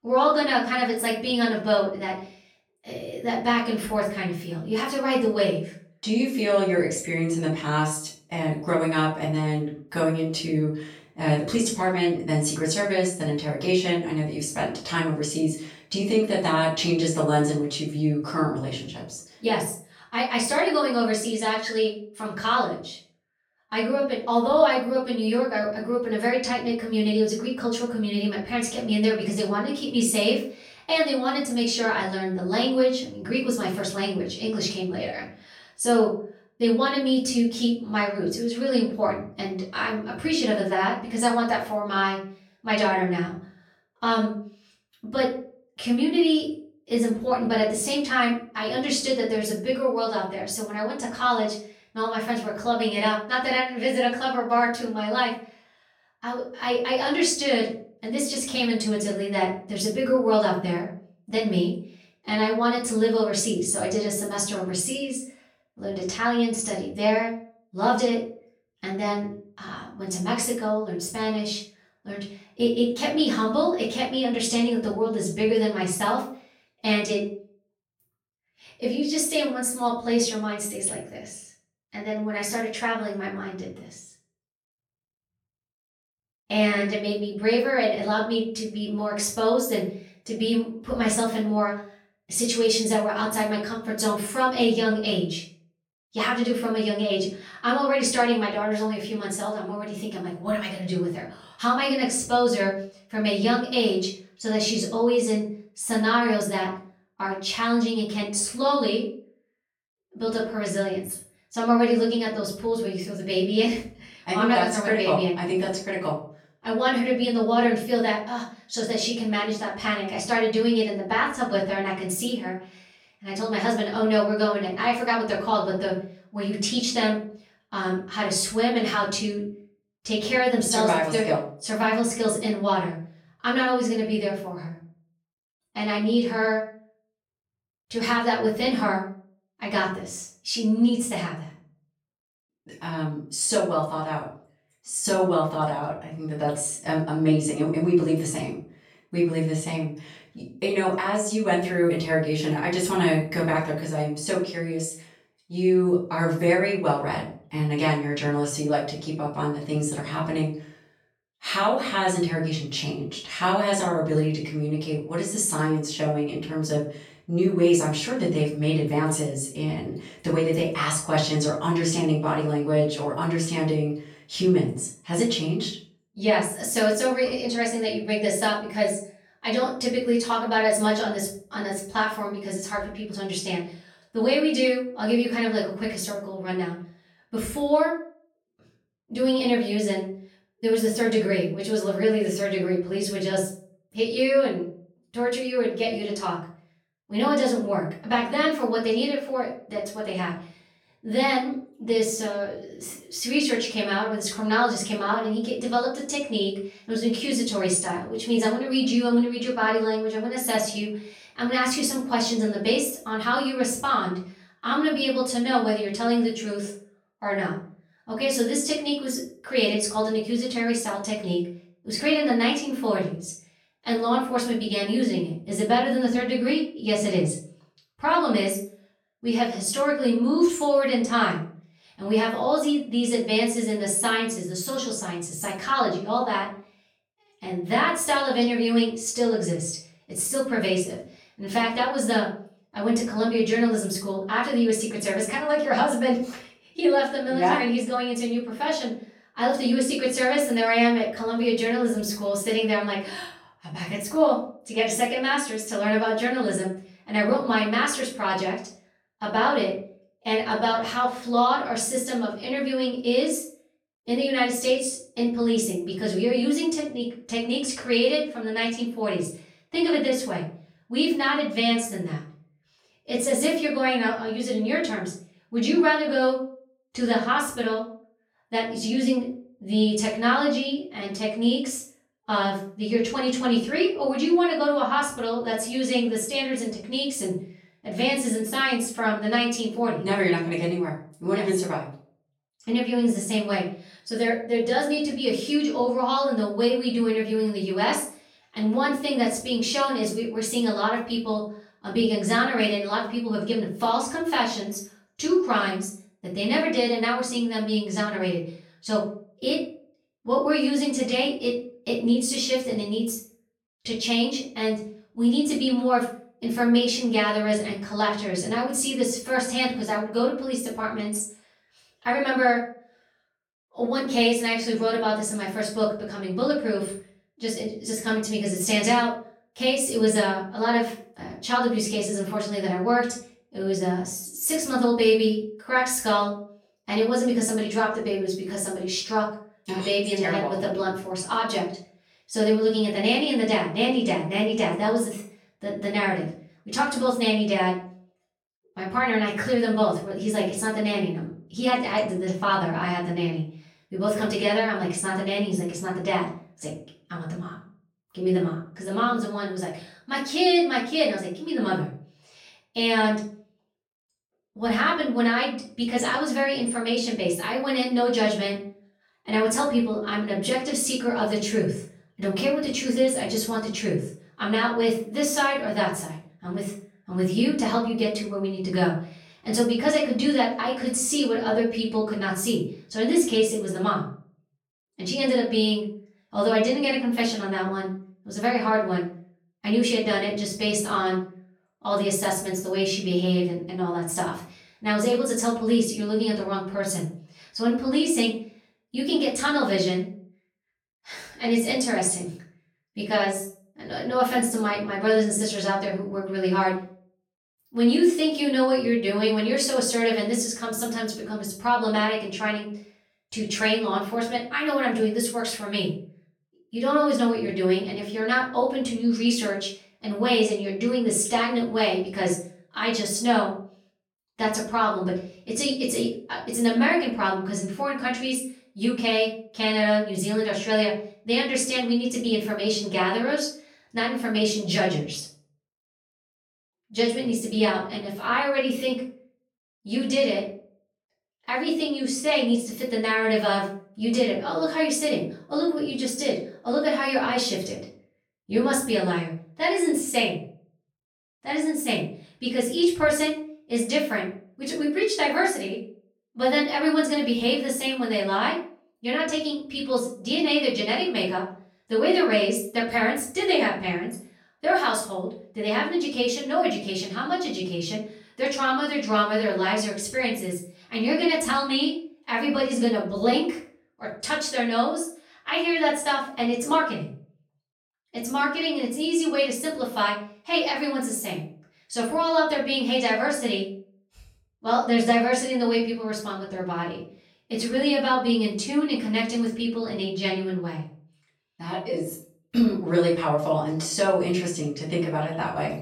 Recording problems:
off-mic speech; far
room echo; slight; dies away in 0.4 s

